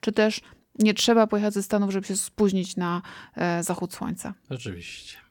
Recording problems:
none

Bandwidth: 17.5 kHz